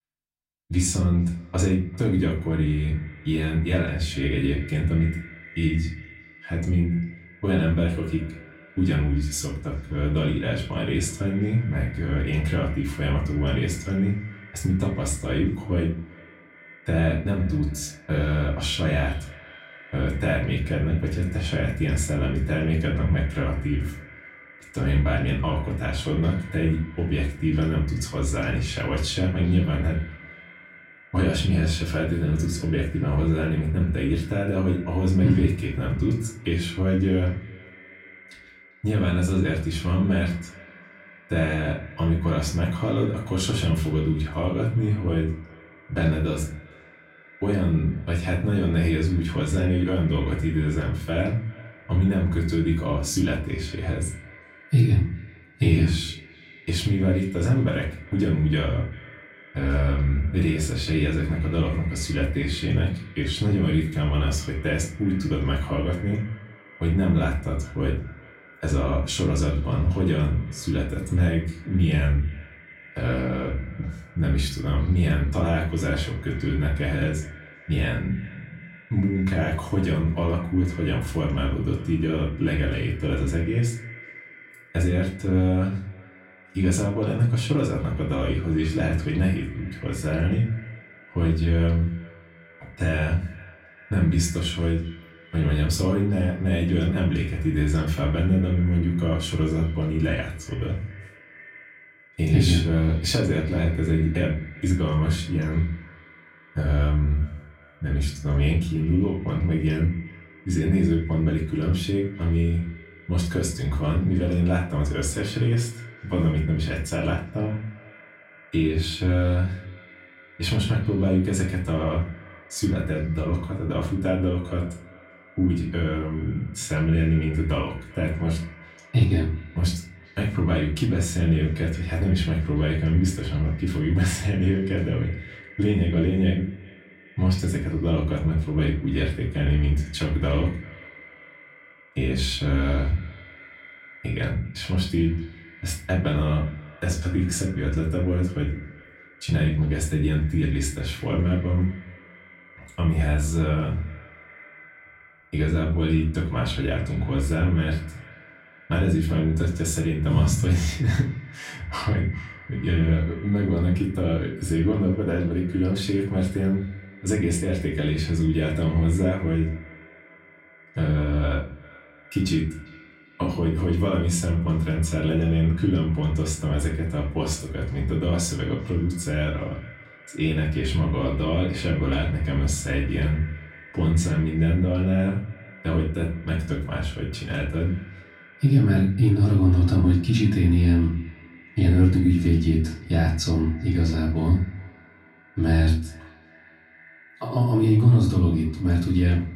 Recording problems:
off-mic speech; far
echo of what is said; faint; throughout; 400 ms later, 20 dB below the speech
room echo; slight; dies away in 0.4 s

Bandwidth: 16 kHz